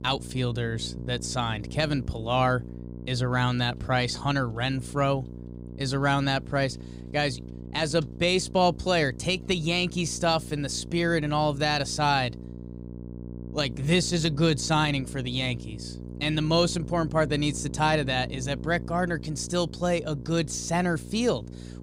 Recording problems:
electrical hum; noticeable; throughout; 60 Hz, 20 dB below the speech

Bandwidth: 15.5 kHz